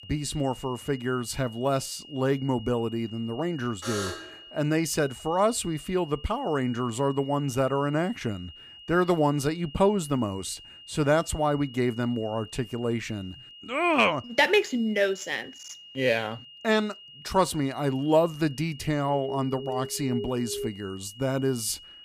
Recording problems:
high-pitched whine; noticeable; throughout; 3 kHz, 20 dB below the speech
alarm; noticeable; at 4 s and from 19 to 21 s; peak 6 dB below the speech

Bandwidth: 15 kHz